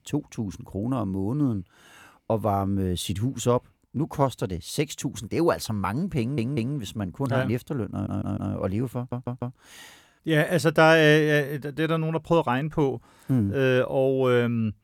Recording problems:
audio stuttering; at 6 s, at 8 s and at 9 s

